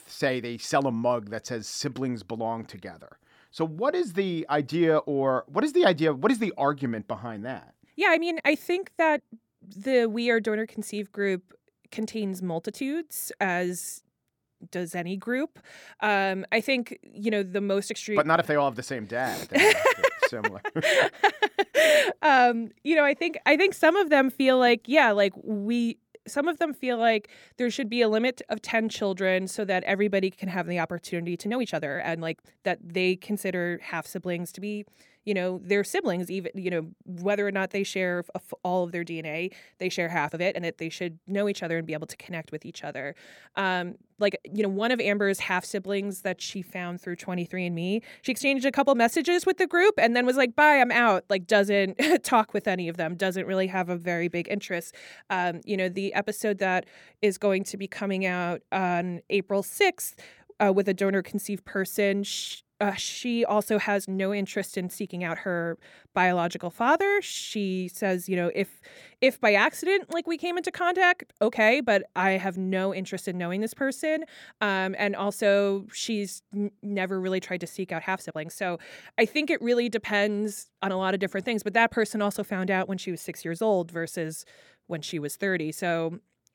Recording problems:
uneven, jittery; strongly; from 8 s to 1:21

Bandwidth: 18 kHz